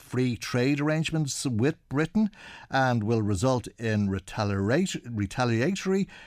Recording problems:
none

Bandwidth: 15.5 kHz